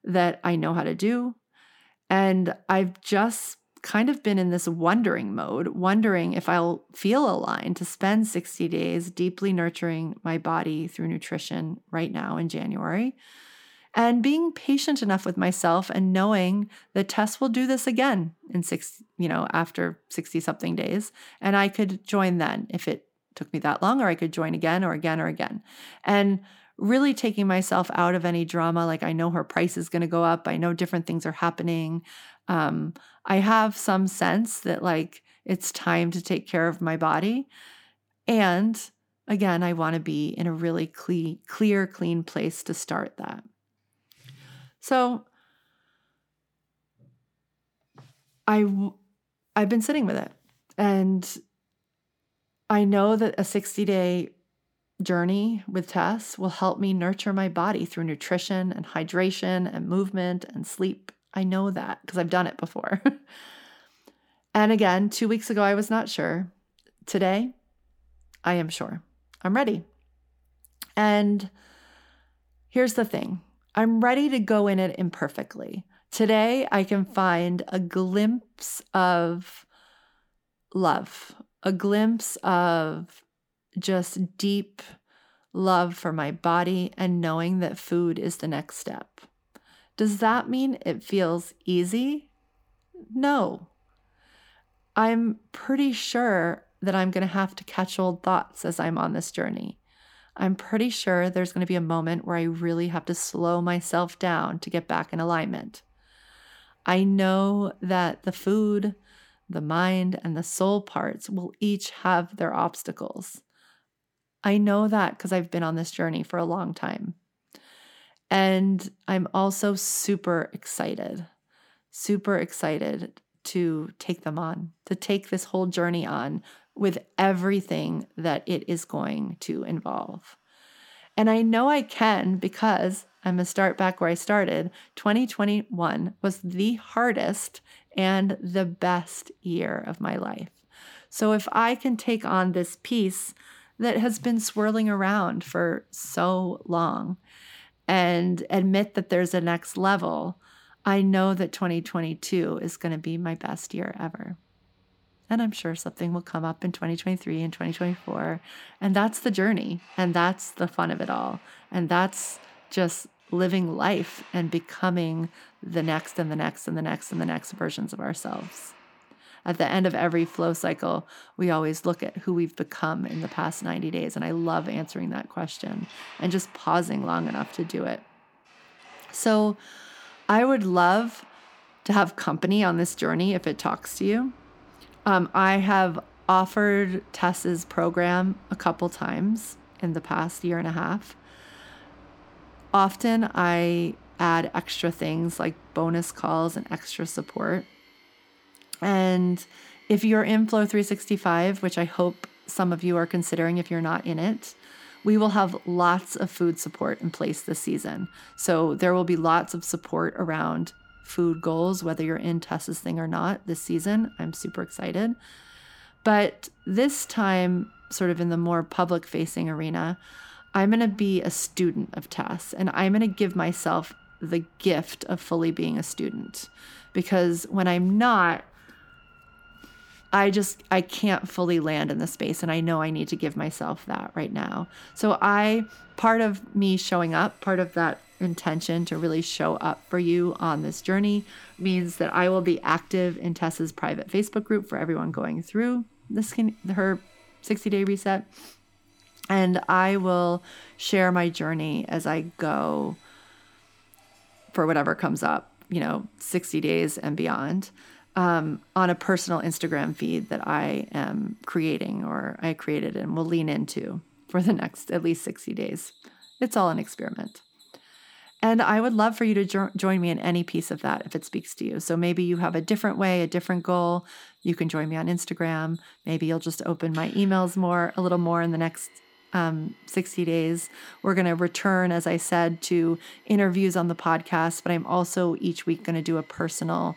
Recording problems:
machinery noise; faint; throughout; 30 dB below the speech

